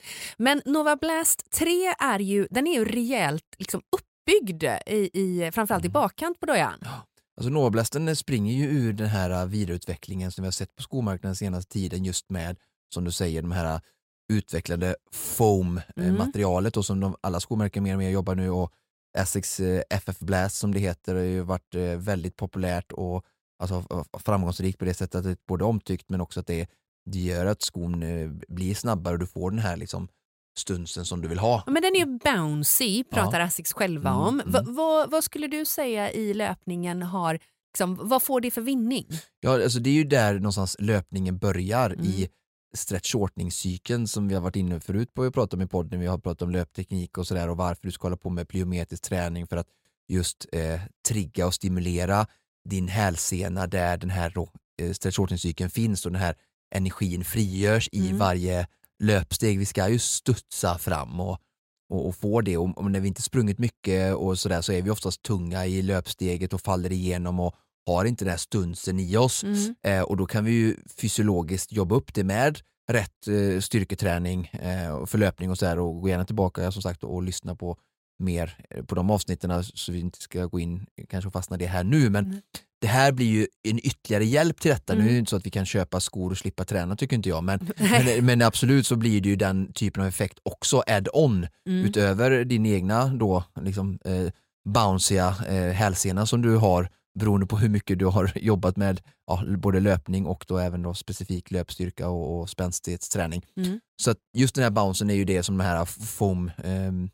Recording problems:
none

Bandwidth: 16 kHz